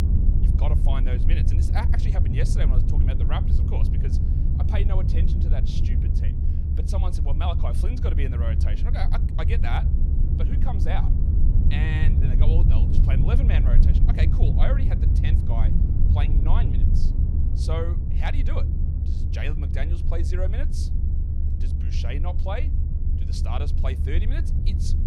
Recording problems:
low rumble; loud; throughout; 3 dB below the speech

